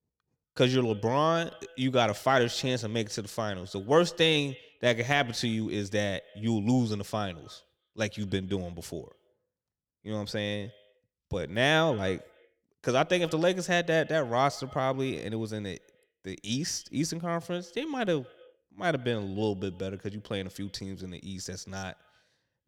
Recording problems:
echo of what is said; faint; throughout; 130 ms later, 25 dB below the speech

